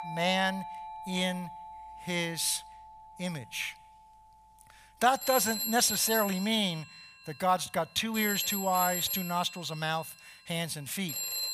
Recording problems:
alarms or sirens; loud; throughout; 4 dB below the speech

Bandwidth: 14.5 kHz